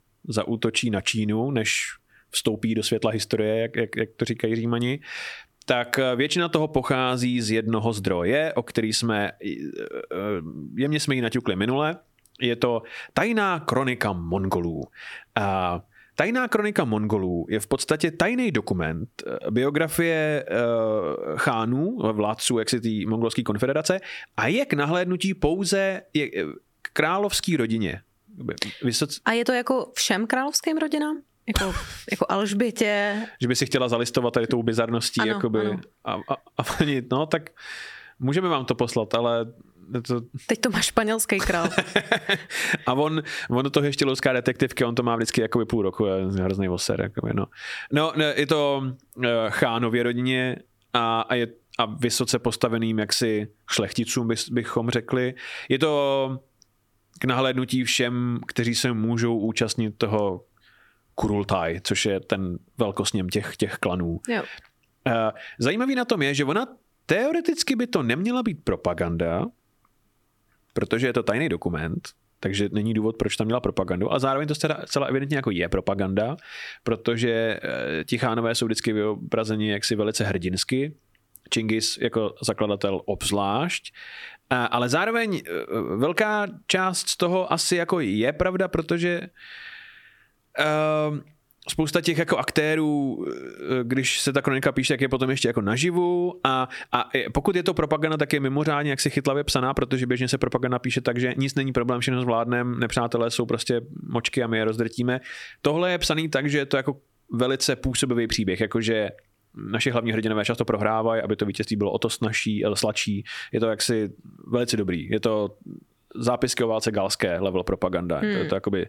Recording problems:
squashed, flat; heavily

